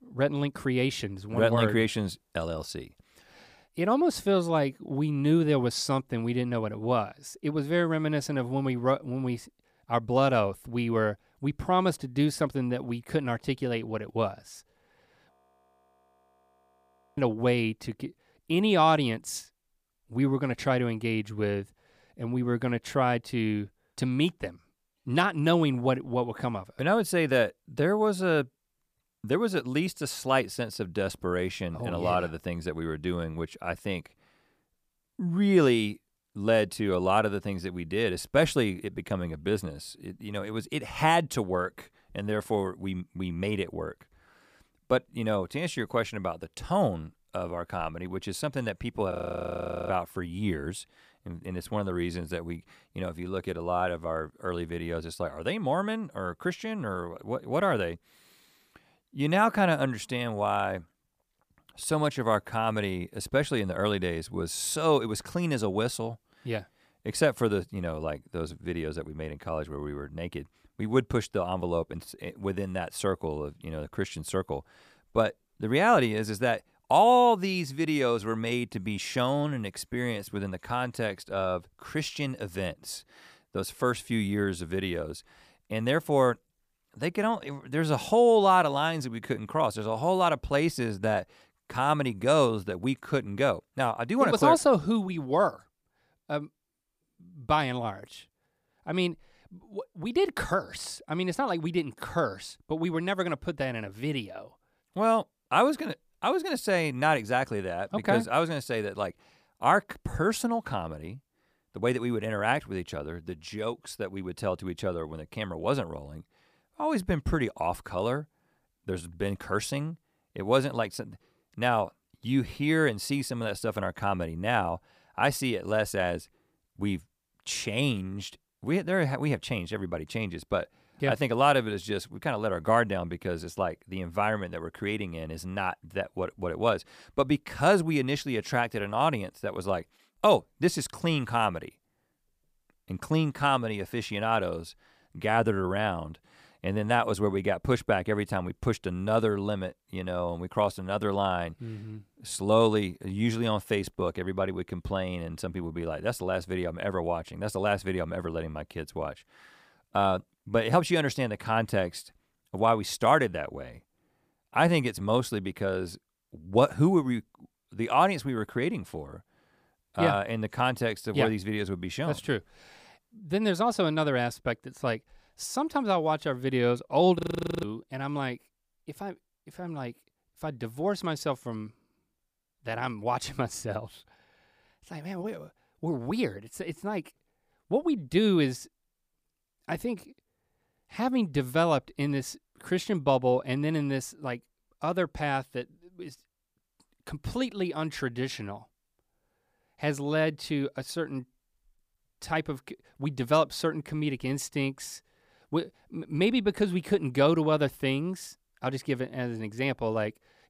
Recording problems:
audio freezing; at 15 s for 2 s, at 49 s for 1 s and at 2:57

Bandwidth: 15 kHz